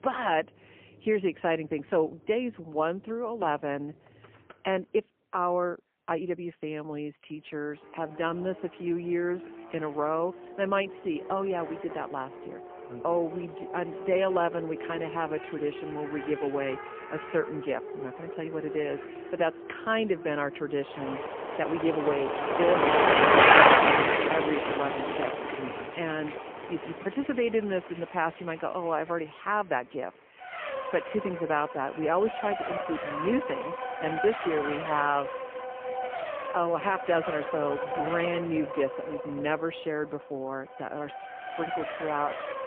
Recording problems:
phone-call audio; poor line
traffic noise; very loud; throughout; 3 dB above the speech

